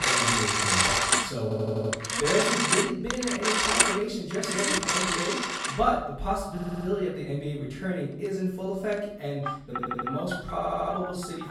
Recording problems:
off-mic speech; far
room echo; noticeable; dies away in 0.7 s
alarms or sirens; very loud; throughout; 5 dB above the speech
audio stuttering; 4 times, first at 1.5 s

